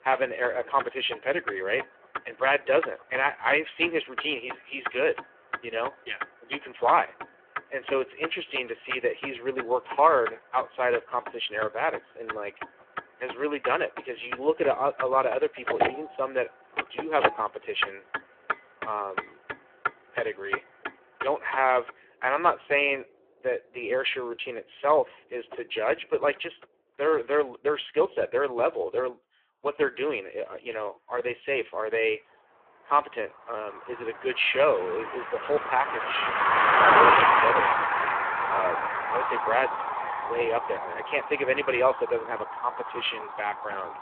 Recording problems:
phone-call audio; poor line
traffic noise; loud; throughout; as loud as the speech

